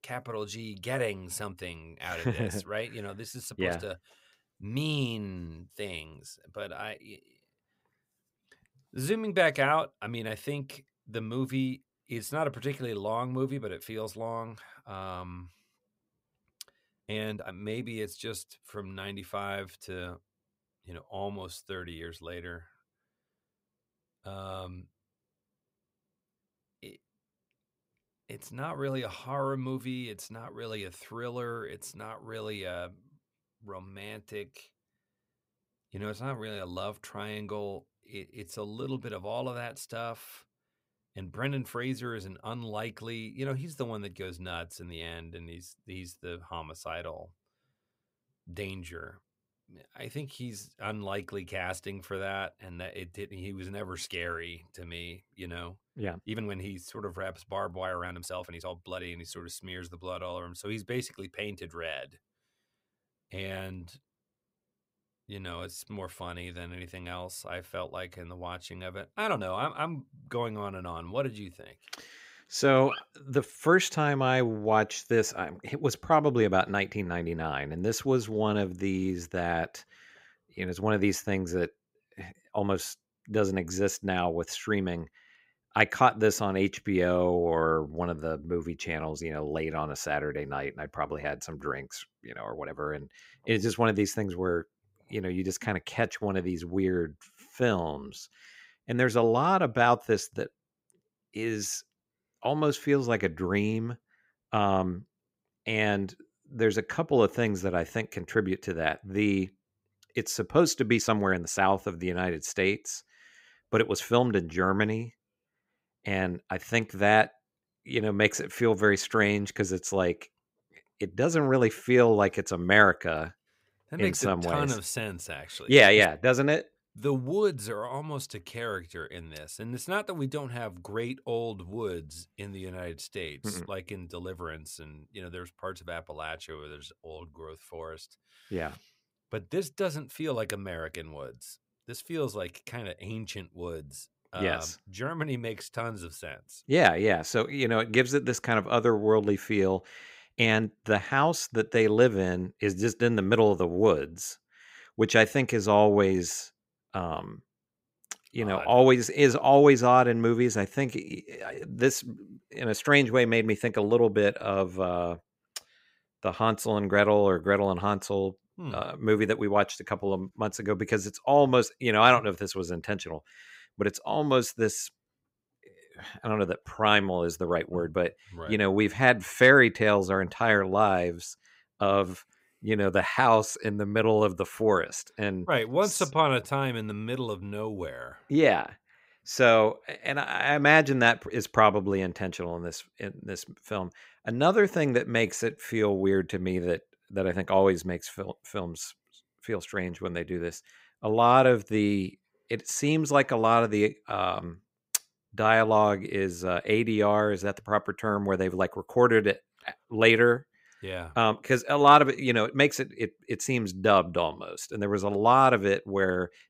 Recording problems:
uneven, jittery; strongly; from 17 s to 3:16

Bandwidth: 15.5 kHz